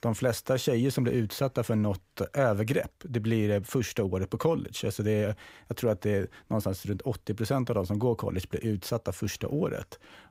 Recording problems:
none

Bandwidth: 15.5 kHz